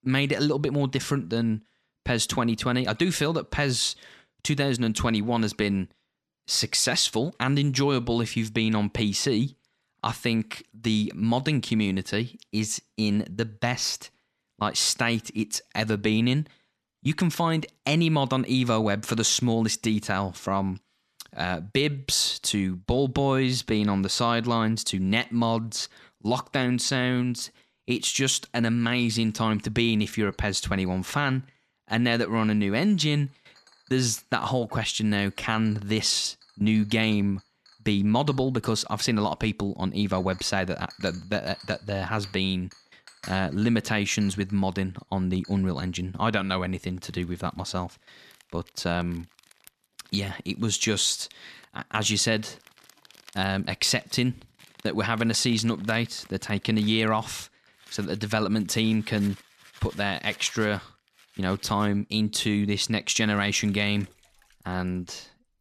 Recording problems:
household noises; faint; throughout; 25 dB below the speech

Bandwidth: 13.5 kHz